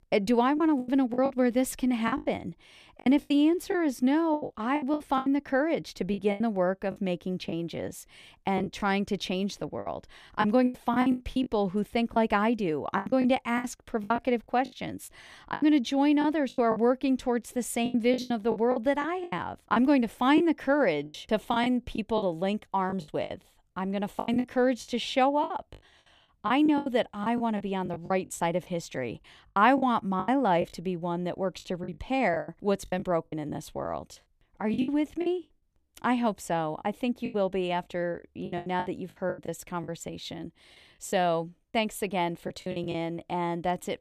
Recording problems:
choppy; very; 12% of the speech affected

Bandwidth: 14.5 kHz